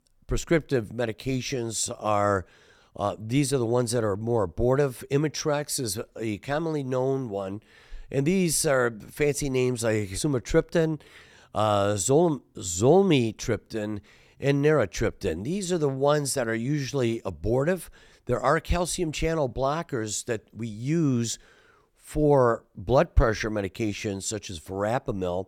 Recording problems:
none

